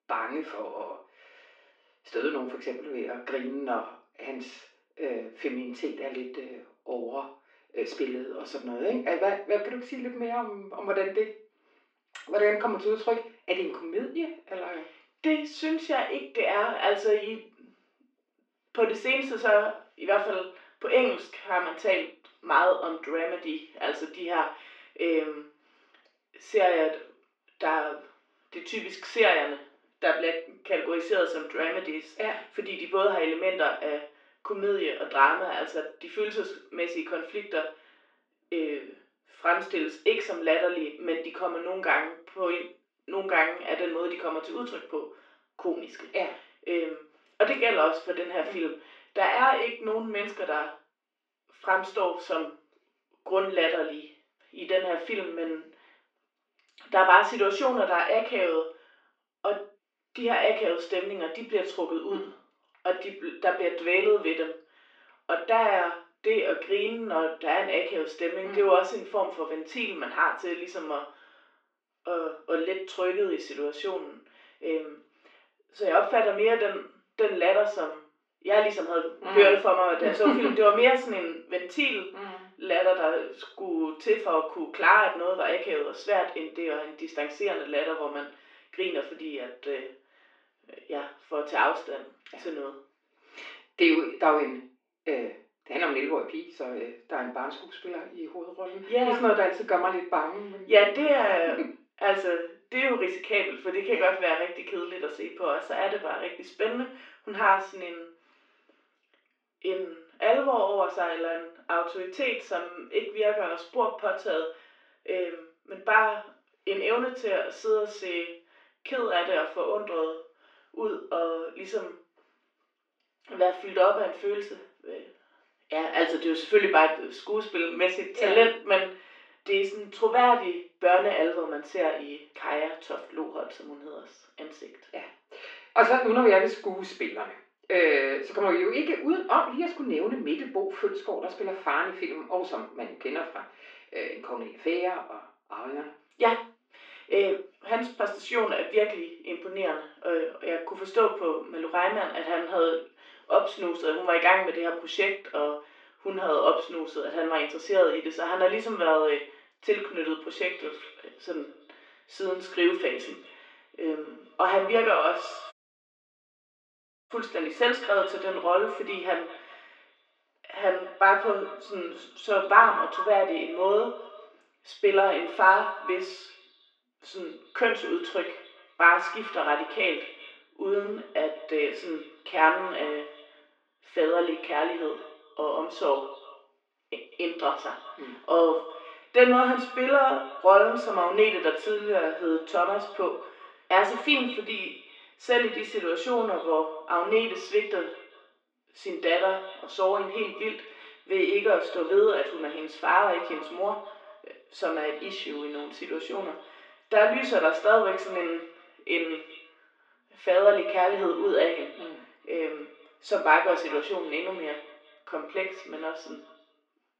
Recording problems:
off-mic speech; far
echo of what is said; noticeable; from 2:40 on; 200 ms later, 15 dB below the speech
room echo; noticeable; dies away in 0.4 s
muffled; slightly; fading above 3 kHz
thin; somewhat; fading below 350 Hz
audio cutting out; at 2:46 for 1.5 s

